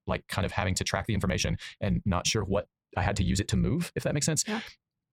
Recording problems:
wrong speed, natural pitch; too fast; 1.7 times normal speed

